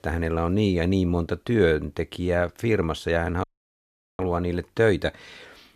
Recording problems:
audio cutting out; at 3.5 s for 1 s

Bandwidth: 14.5 kHz